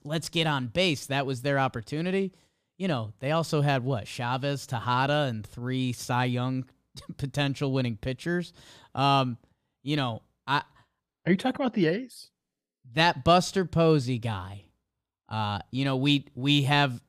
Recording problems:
none

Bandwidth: 15 kHz